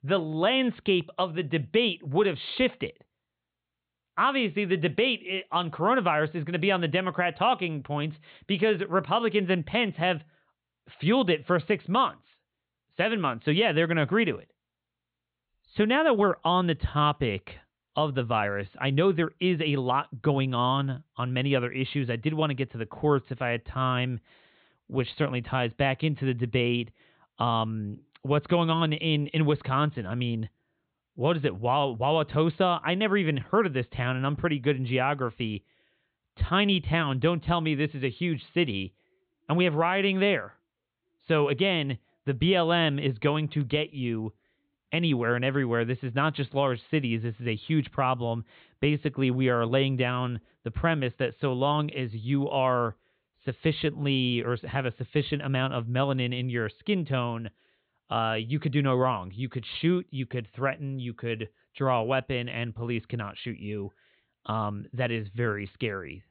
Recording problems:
high frequencies cut off; severe; nothing above 4 kHz

